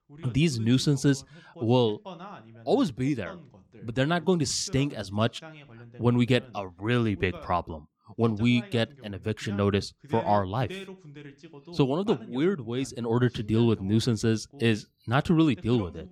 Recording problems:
voice in the background; faint; throughout; 20 dB below the speech

